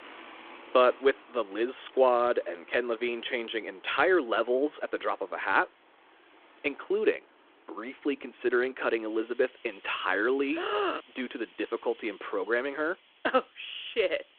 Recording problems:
phone-call audio
traffic noise; faint; throughout; 25 dB below the speech

